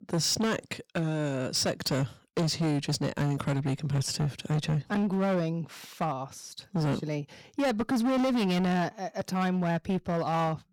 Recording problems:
distortion; heavy; 17% of the sound clipped

